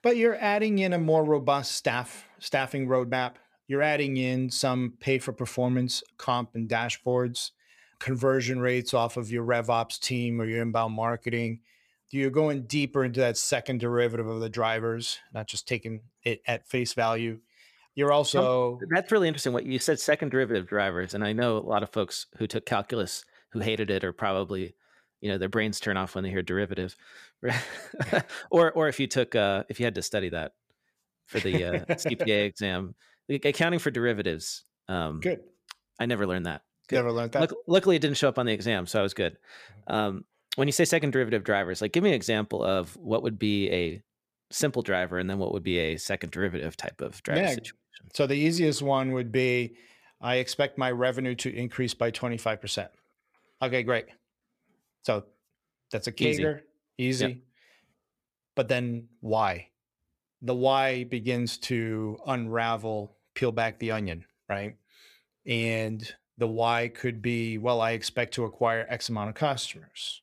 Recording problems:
none

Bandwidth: 14.5 kHz